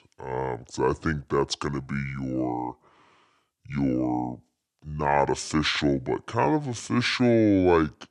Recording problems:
wrong speed and pitch; too slow and too low; 0.6 times normal speed

